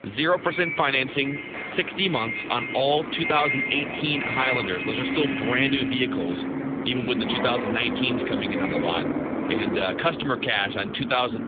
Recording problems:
phone-call audio; nothing above 3.5 kHz
traffic noise; loud; throughout; 3 dB below the speech

